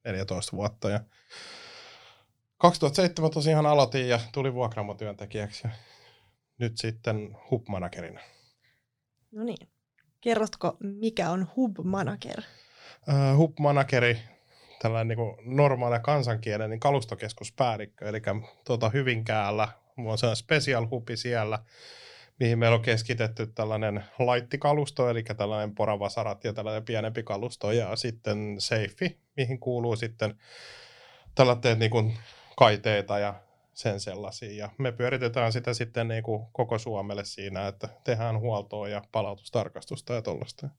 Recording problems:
none

